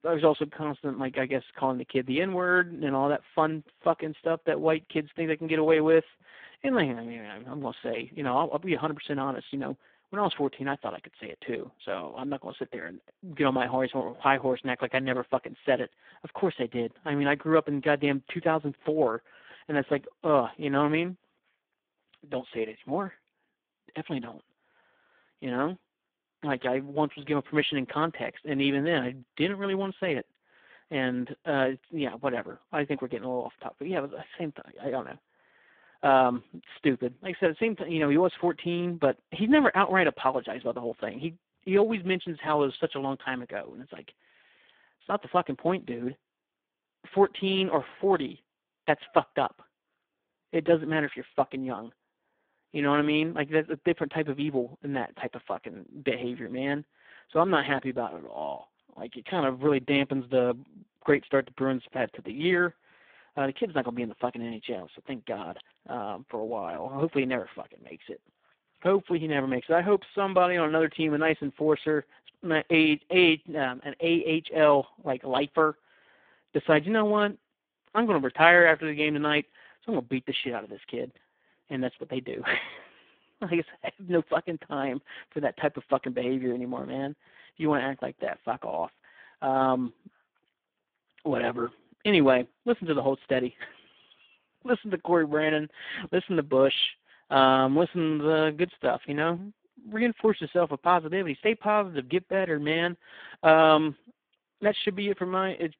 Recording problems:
phone-call audio; poor line

